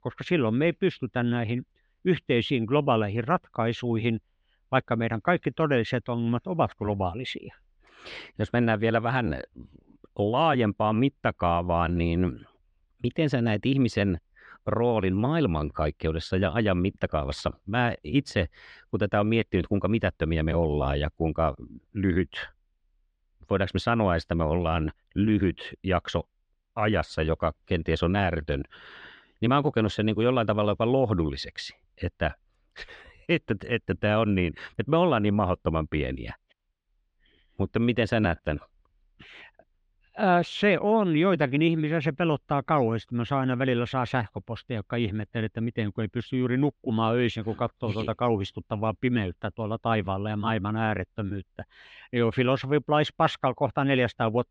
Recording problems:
muffled; very slightly; fading above 3 kHz

